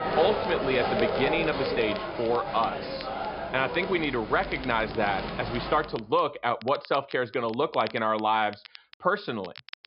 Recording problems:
high frequencies cut off; noticeable; nothing above 5.5 kHz
crowd noise; loud; until 5.5 s; 4 dB below the speech
crackle, like an old record; noticeable; 20 dB below the speech

